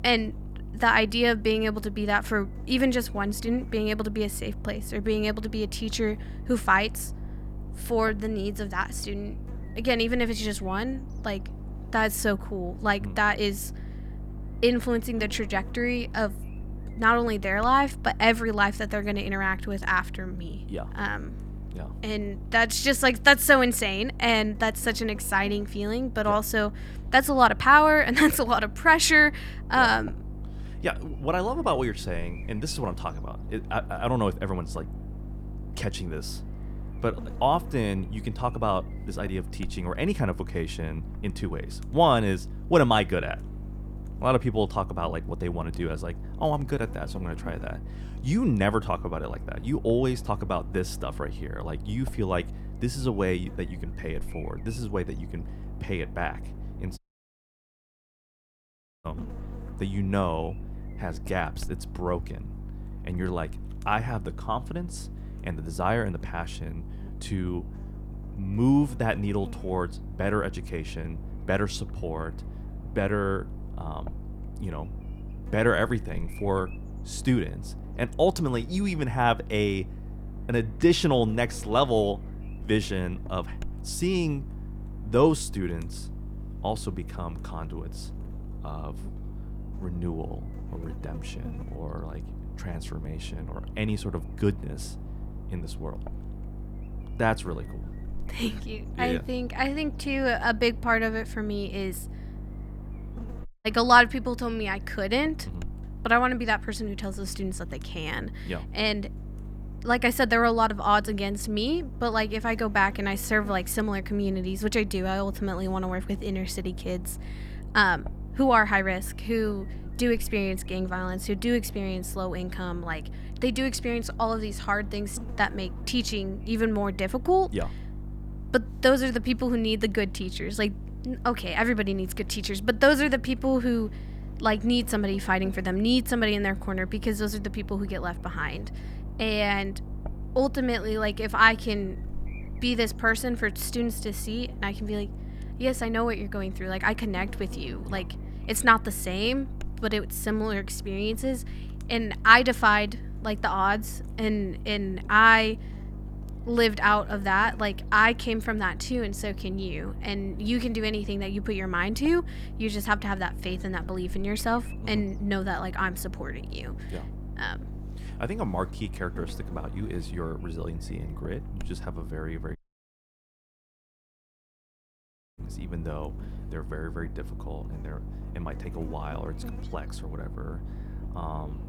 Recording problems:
electrical hum; faint; throughout; 50 Hz, 25 dB below the speech
audio cutting out; at 57 s for 2 s, at 1:43 and at 2:53 for 3 s

